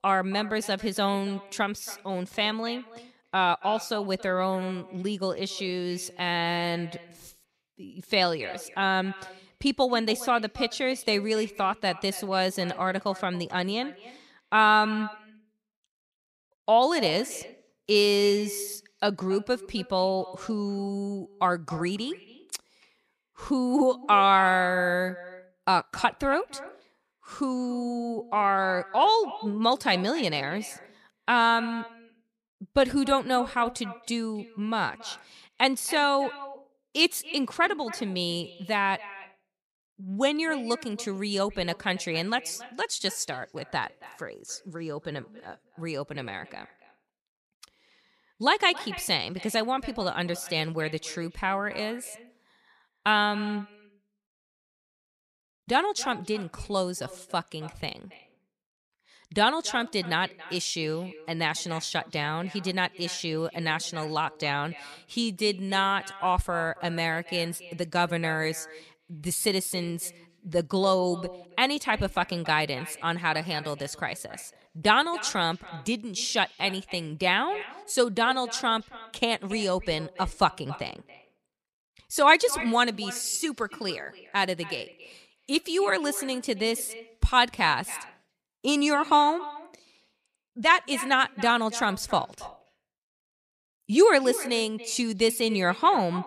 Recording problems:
echo of what is said; noticeable; throughout; 280 ms later, 15 dB below the speech

